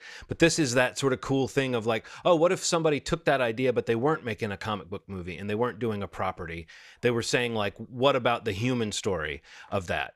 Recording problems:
none

